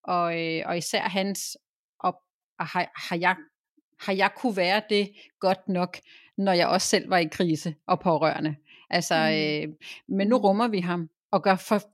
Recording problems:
none

